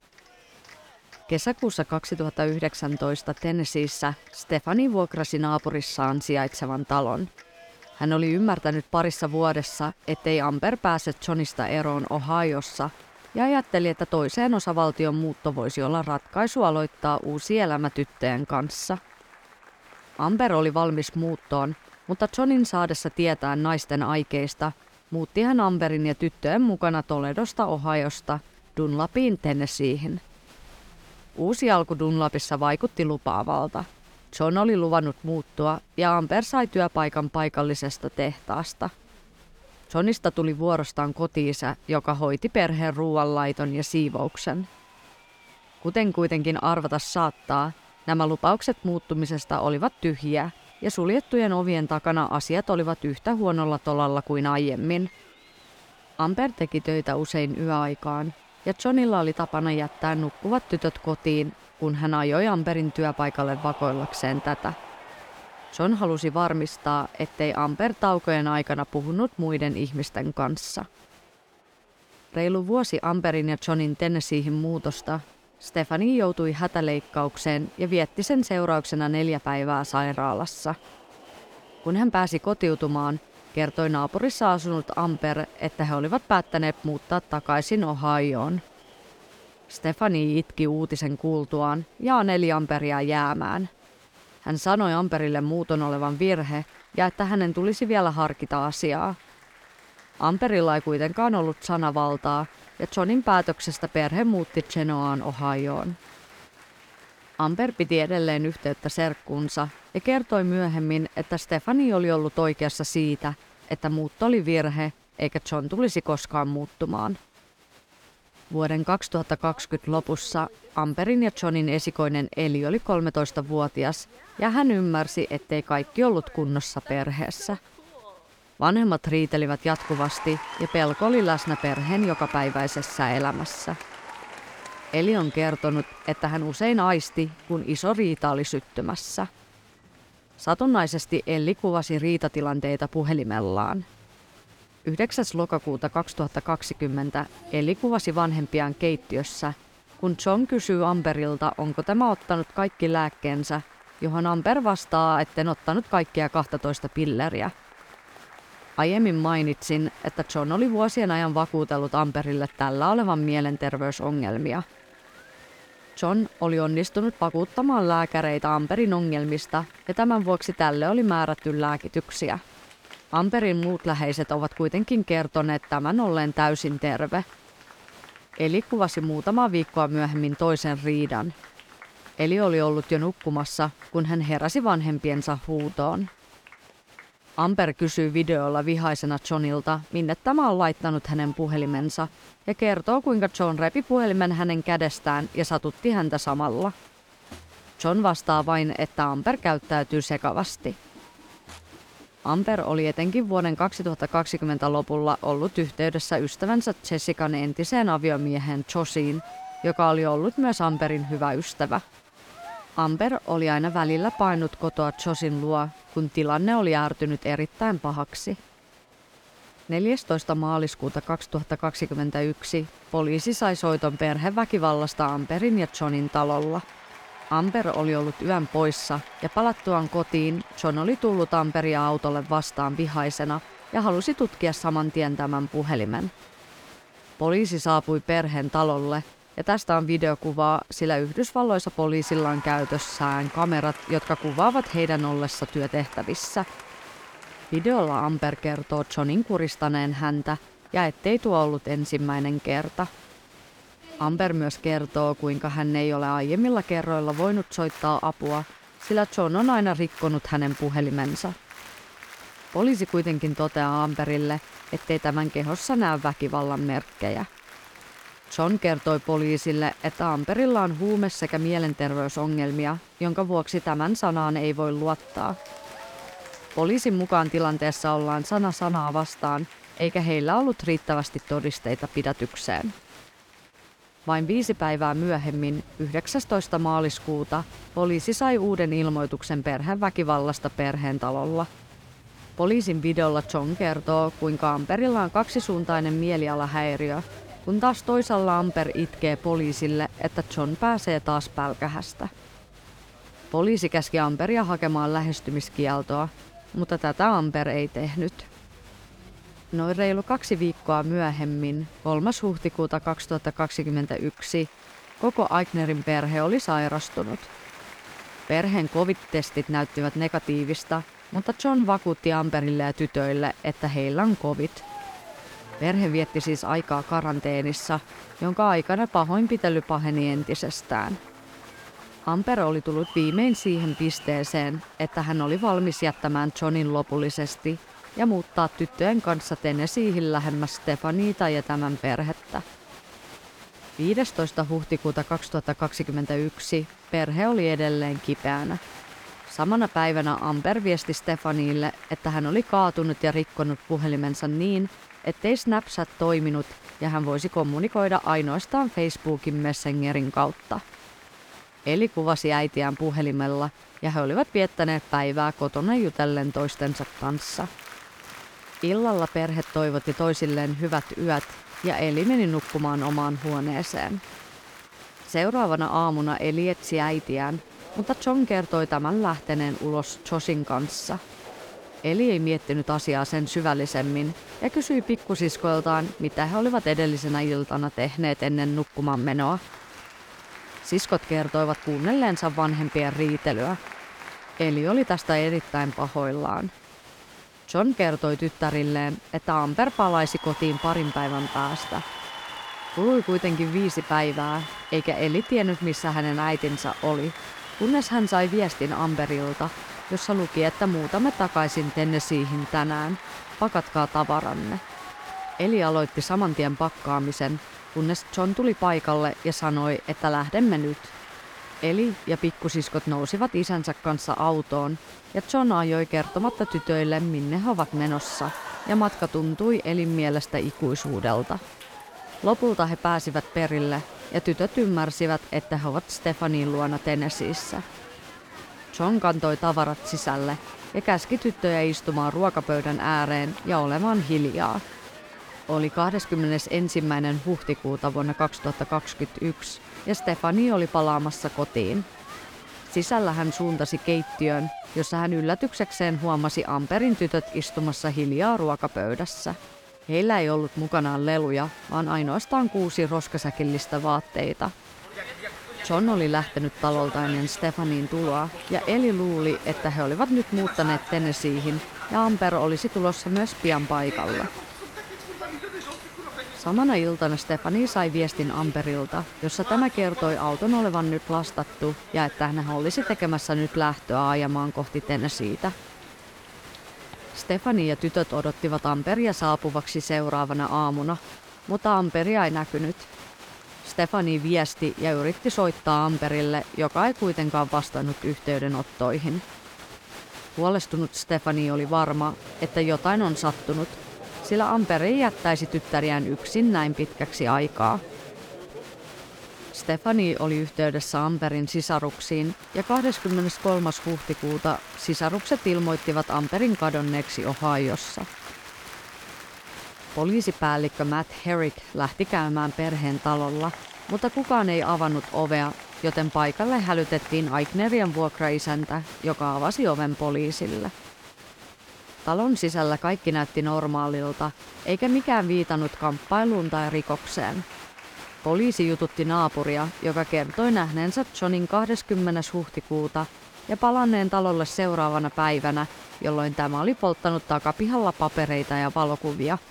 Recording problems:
crowd noise; noticeable; throughout; 20 dB below the speech

